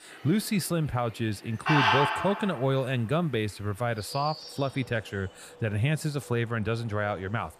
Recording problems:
animal sounds; very loud; throughout; 1 dB above the speech

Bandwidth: 14.5 kHz